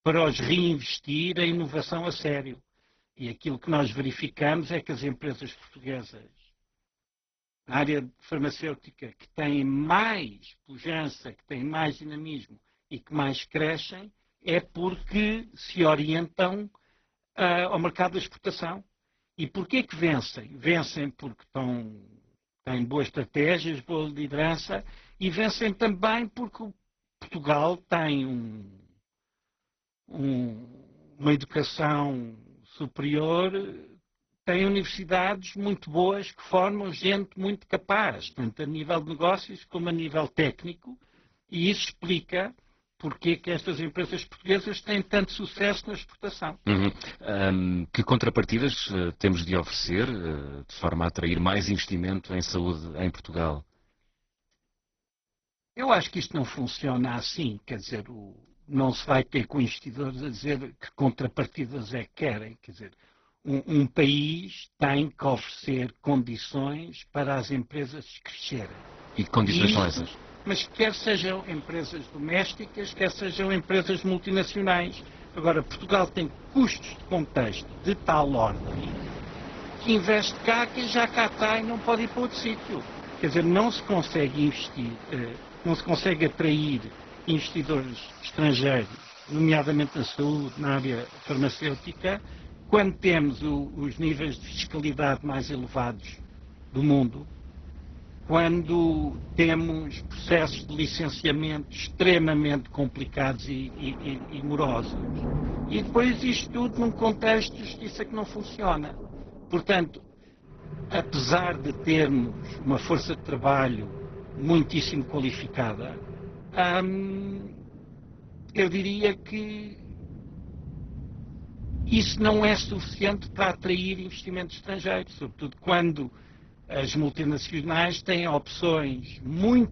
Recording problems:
garbled, watery; badly; nothing above 6 kHz
rain or running water; noticeable; from 1:09 on; 15 dB below the speech

